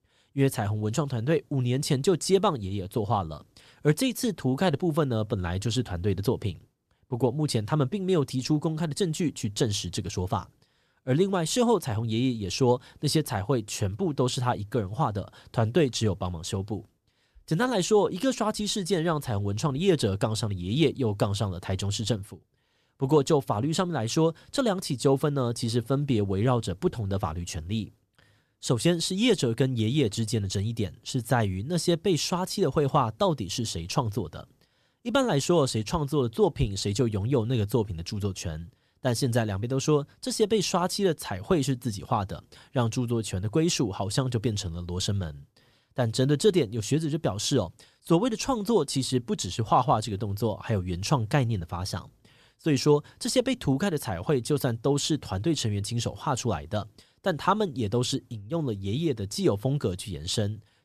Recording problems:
none

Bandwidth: 14.5 kHz